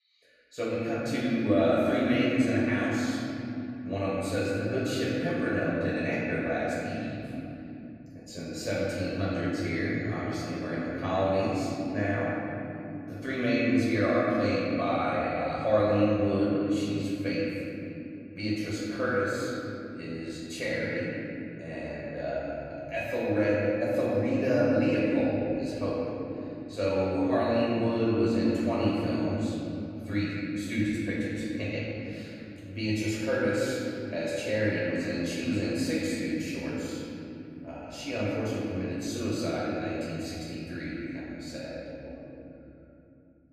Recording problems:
room echo; strong; dies away in 3 s
off-mic speech; far

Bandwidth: 14.5 kHz